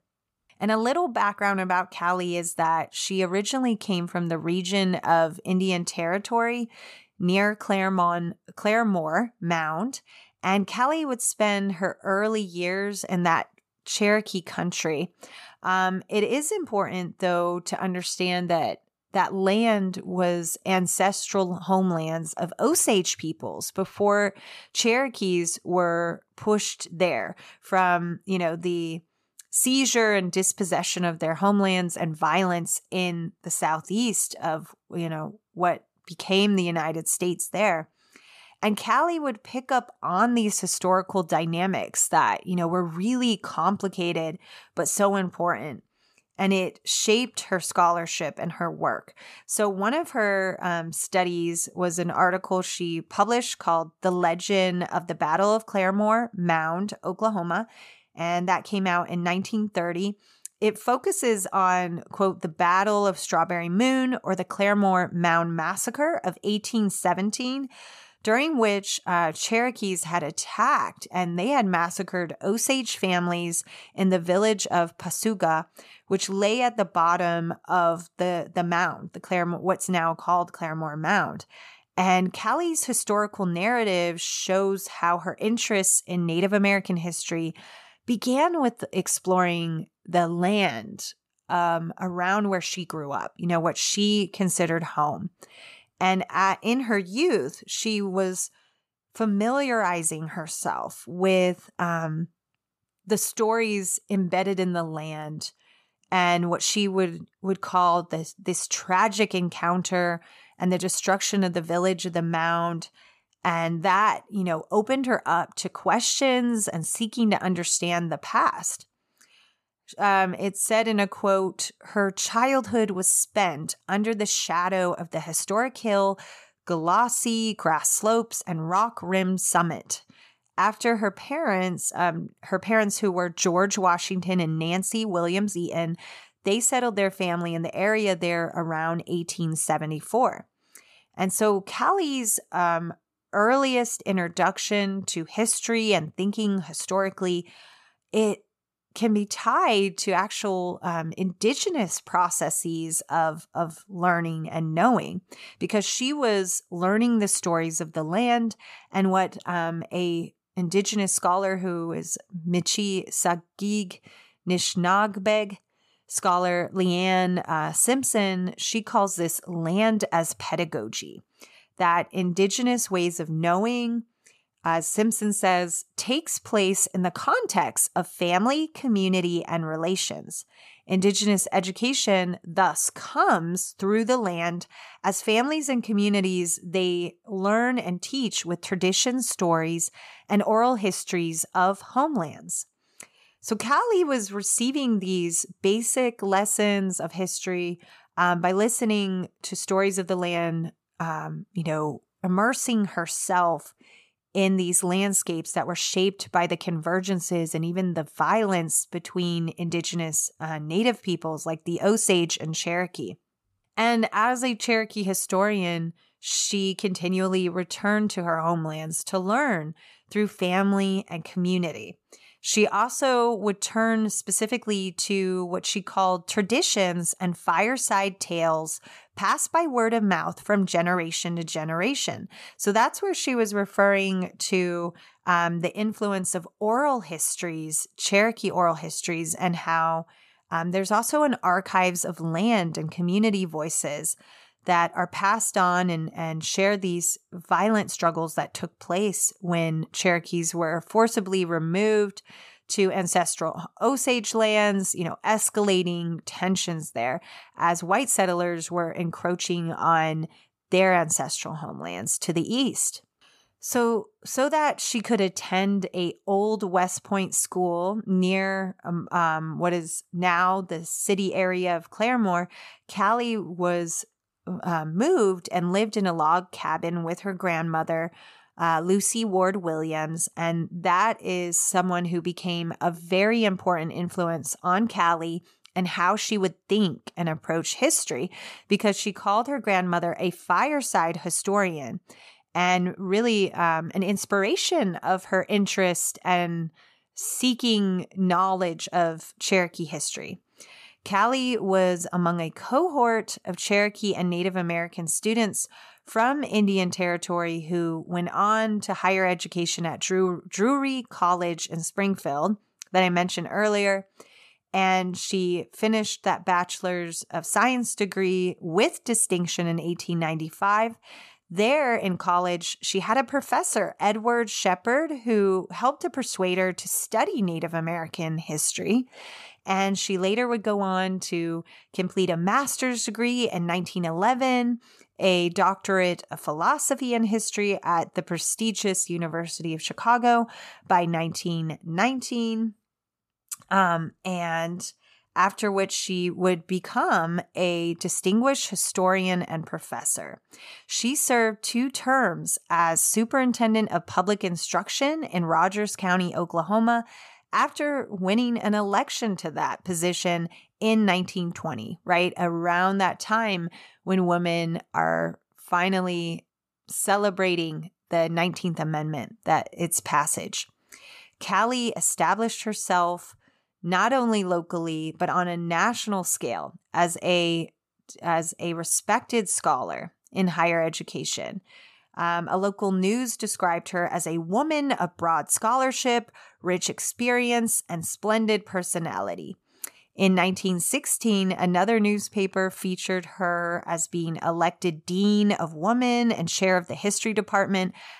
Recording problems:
none

